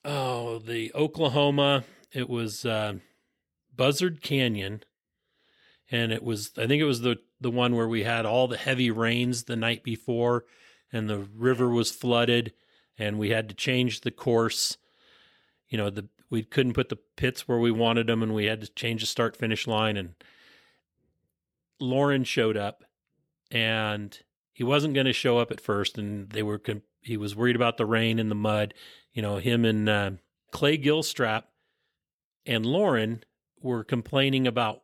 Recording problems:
none

